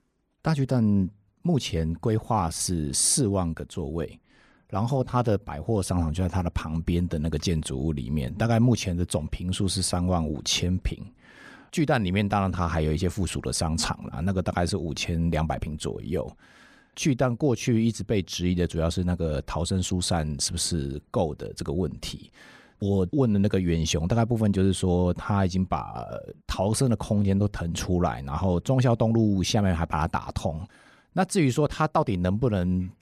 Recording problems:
none

